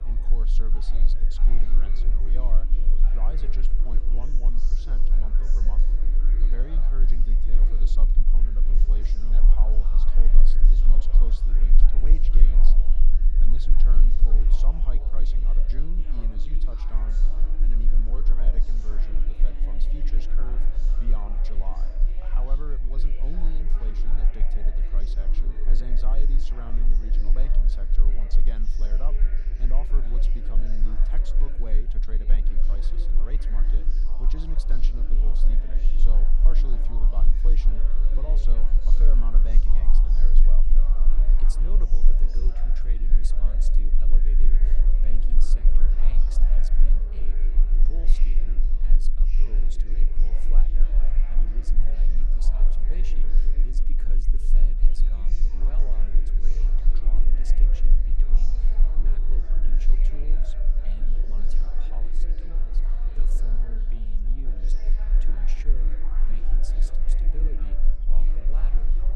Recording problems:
chatter from many people; loud; throughout; 5 dB below the speech
low rumble; loud; throughout; 6 dB below the speech

